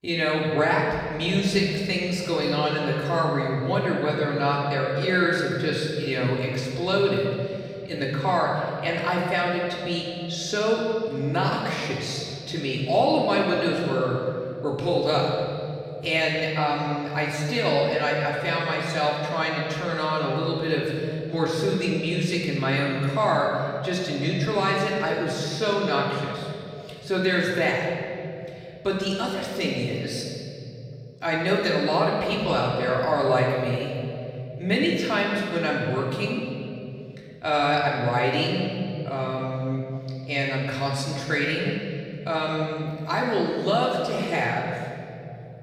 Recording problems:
off-mic speech; far
room echo; noticeable; dies away in 2.6 s

